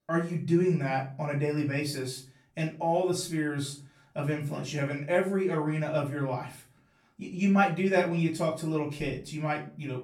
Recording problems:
off-mic speech; far
room echo; slight; dies away in 0.4 s

